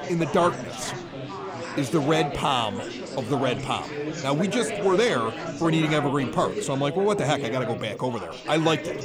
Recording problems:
chatter from many people; loud; throughout; 7 dB below the speech
rain or running water; faint; throughout; 20 dB below the speech

